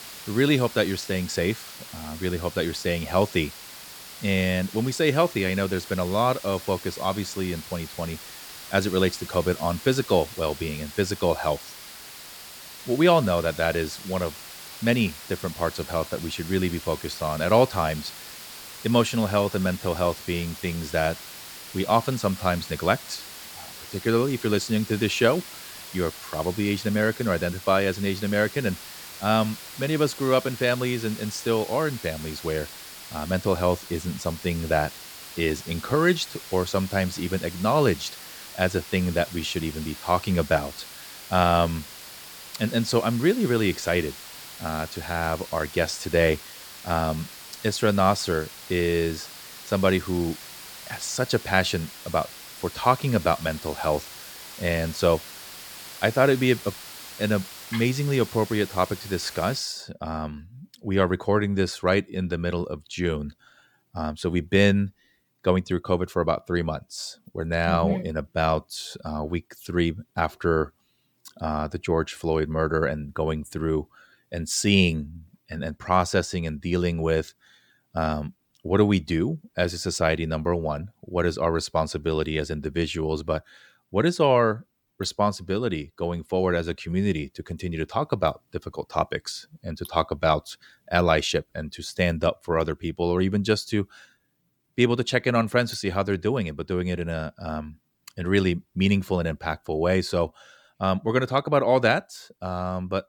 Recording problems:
hiss; noticeable; until 1:00; 15 dB below the speech

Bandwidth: 18.5 kHz